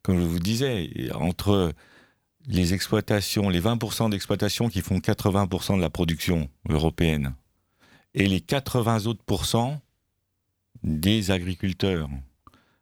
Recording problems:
none

